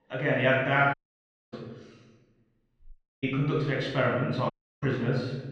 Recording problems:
off-mic speech; far
room echo; noticeable; dies away in 1 s
muffled; slightly; fading above 2.5 kHz
audio cutting out; at 1 s for 0.5 s, at 3 s and at 4.5 s

